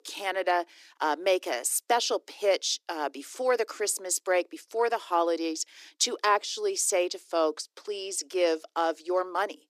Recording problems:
thin; very; fading below 300 Hz

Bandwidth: 14.5 kHz